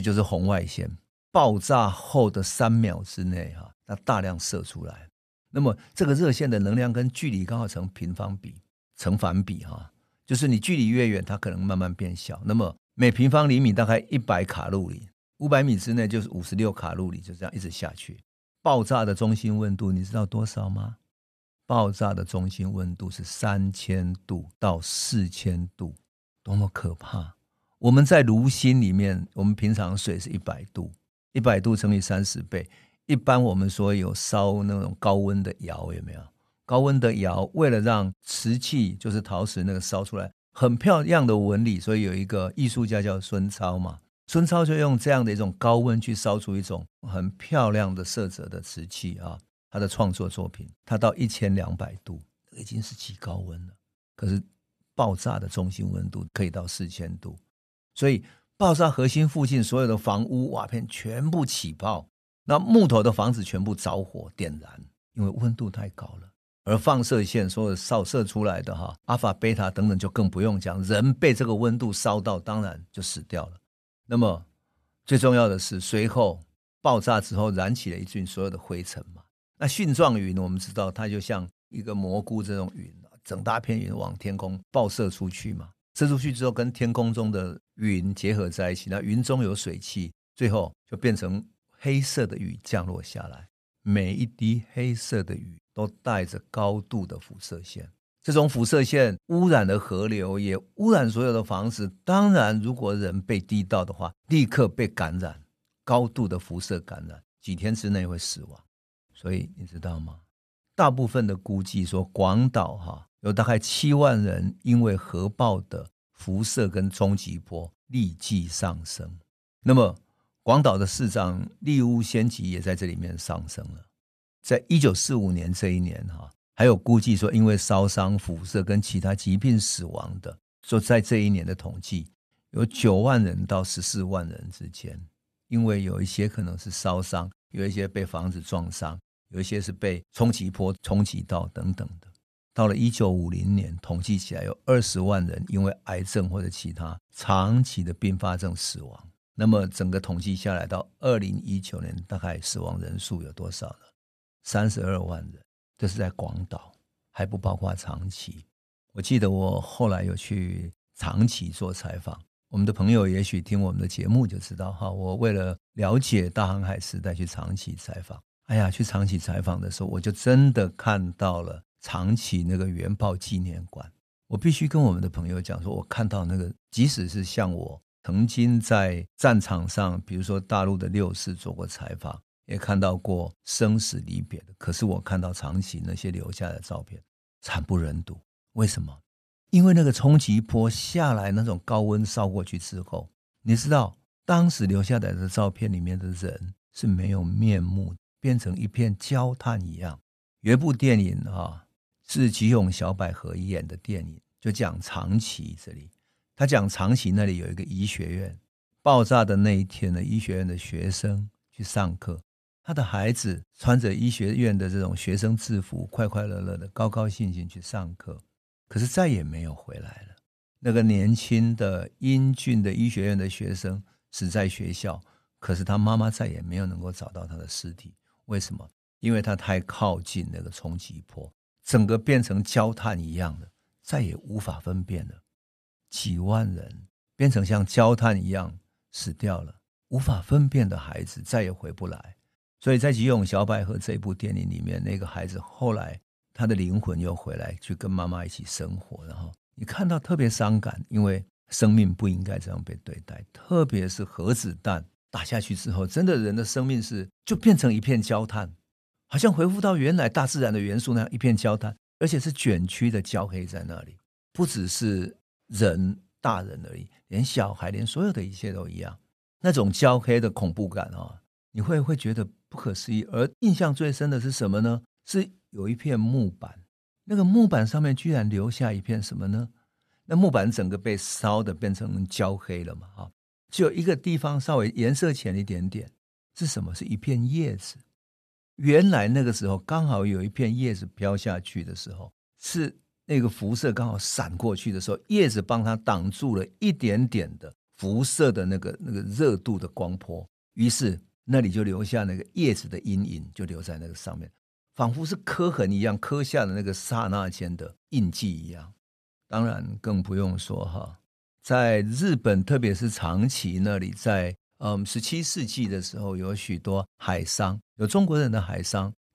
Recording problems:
abrupt cut into speech; at the start

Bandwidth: 13.5 kHz